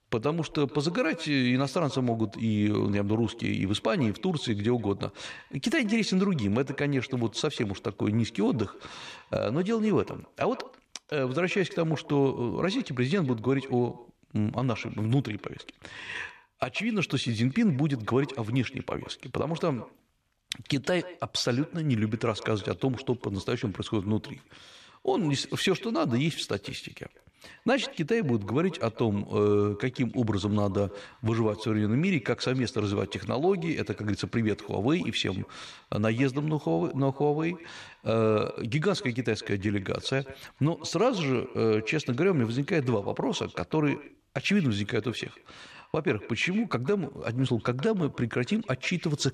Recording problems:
echo of what is said; faint; throughout; 140 ms later, 20 dB below the speech

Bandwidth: 13.5 kHz